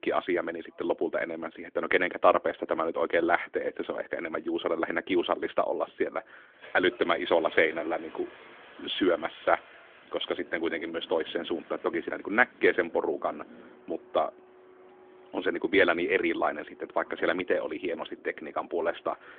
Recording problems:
phone-call audio; nothing above 3.5 kHz
traffic noise; faint; throughout; 20 dB below the speech

